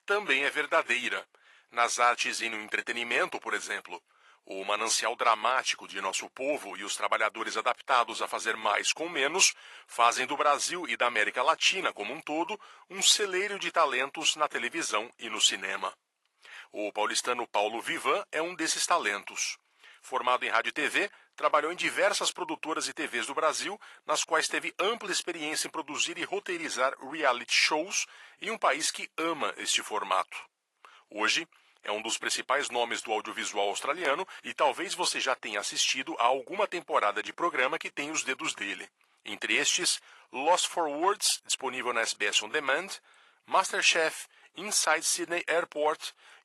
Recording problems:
thin; very; fading below 900 Hz
garbled, watery; slightly; nothing above 11.5 kHz

